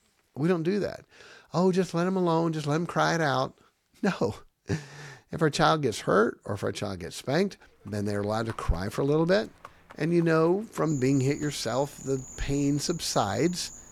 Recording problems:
animal sounds; noticeable; from 8 s on; 20 dB below the speech

